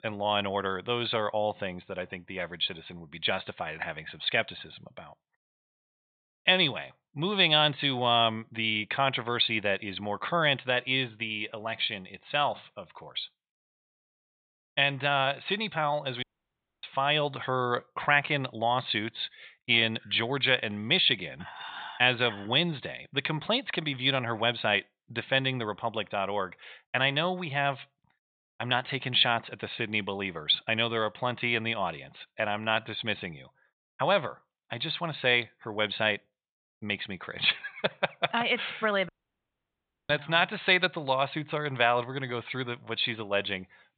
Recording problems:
high frequencies cut off; severe; nothing above 4 kHz
thin; somewhat; fading below 950 Hz
audio cutting out; at 16 s for 0.5 s and at 39 s for 1 s

